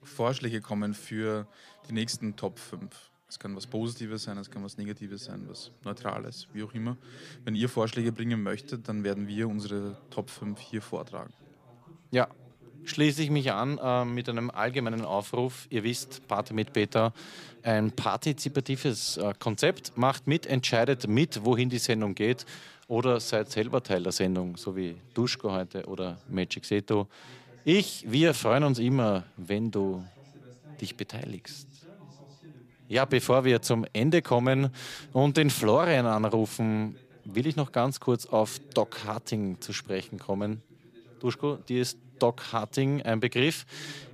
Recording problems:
background chatter; faint; throughout; 2 voices, 25 dB below the speech

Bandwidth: 15 kHz